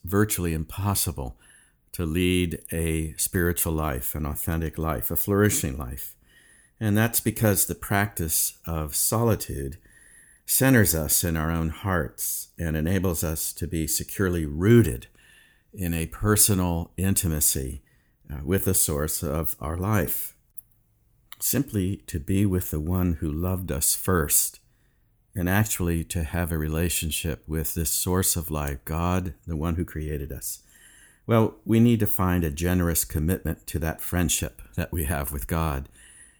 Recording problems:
none

